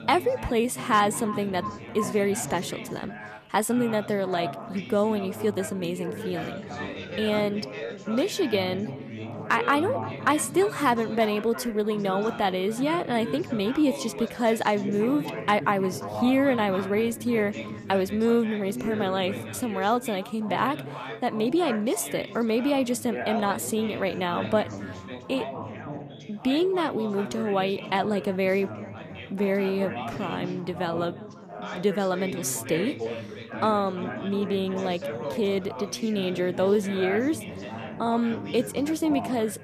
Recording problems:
echo of what is said; faint; throughout; 350 ms later, 20 dB below the speech
background chatter; loud; throughout; 4 voices, 10 dB below the speech
uneven, jittery; slightly; from 3 to 38 s

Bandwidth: 14.5 kHz